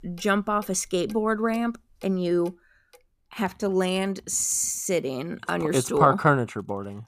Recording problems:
household noises; faint; throughout; 30 dB below the speech

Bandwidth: 14.5 kHz